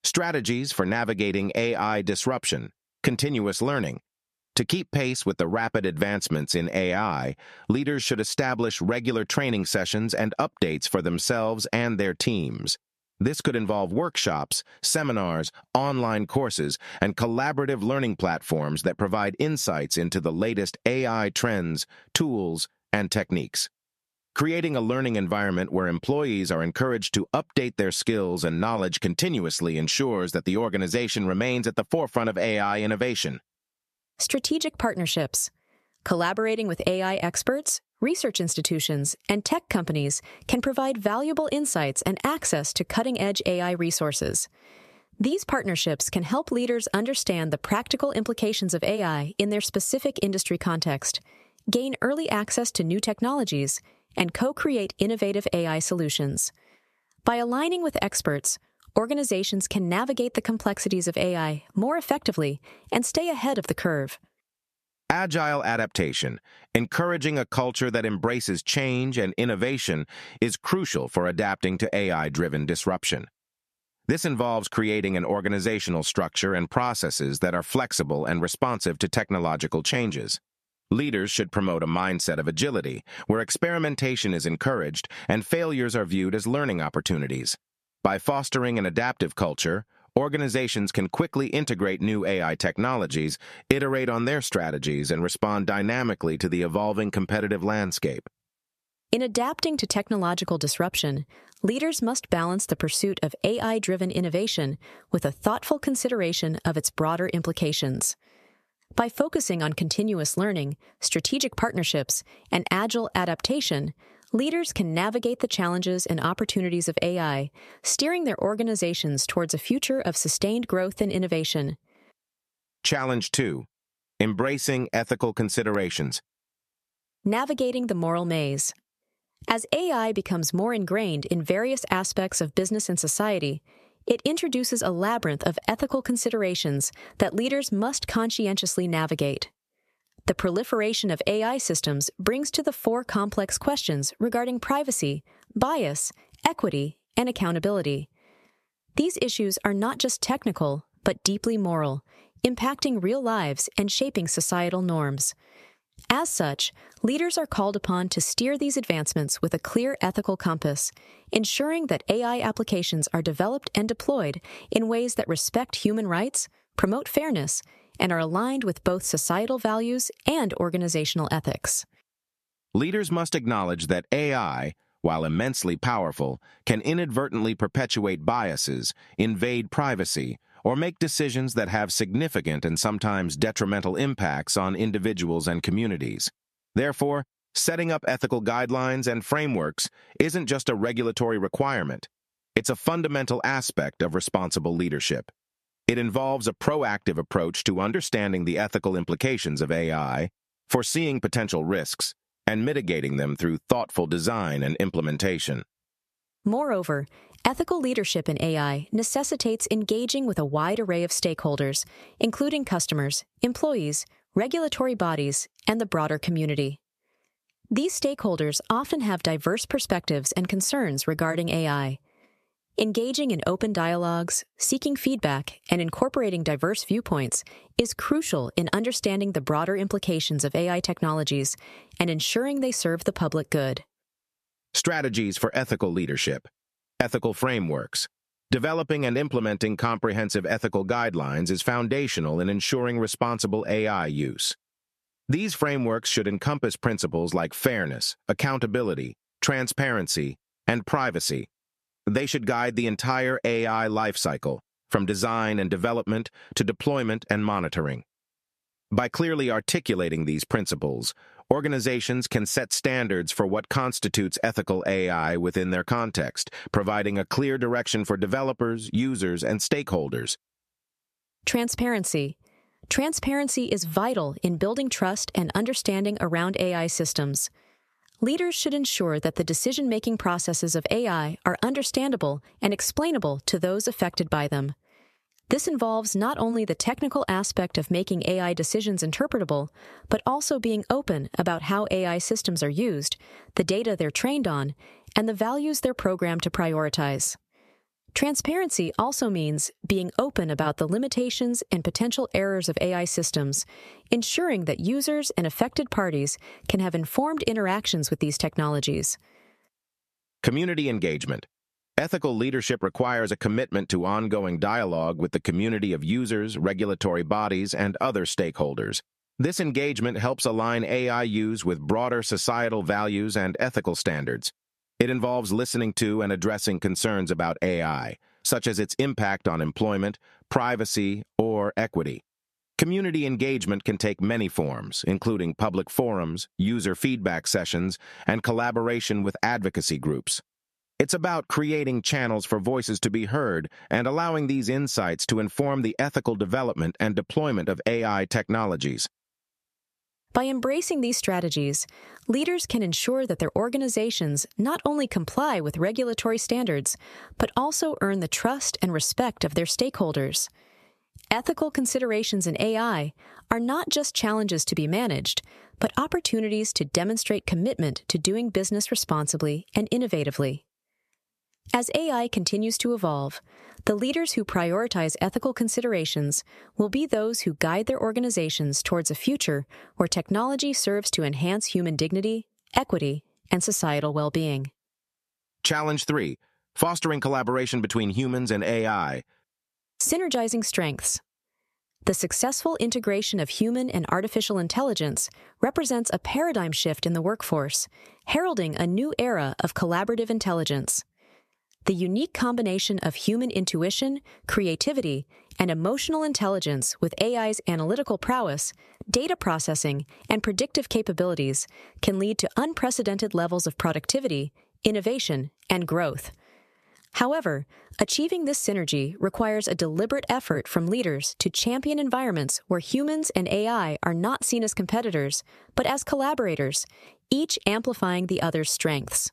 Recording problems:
squashed, flat; somewhat

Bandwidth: 14 kHz